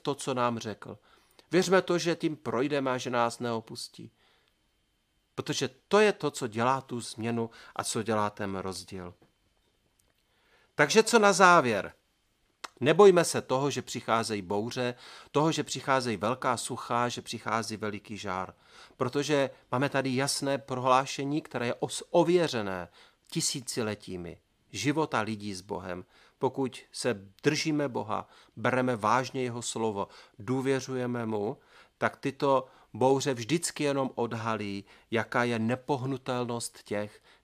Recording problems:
none

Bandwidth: 15 kHz